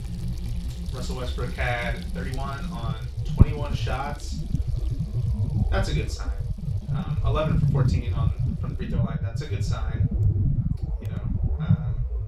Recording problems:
off-mic speech; far
room echo; slight; dies away in 0.3 s
low rumble; loud; throughout; 6 dB below the speech
household noises; noticeable; throughout; 15 dB below the speech
uneven, jittery; strongly; from 1 to 9 s

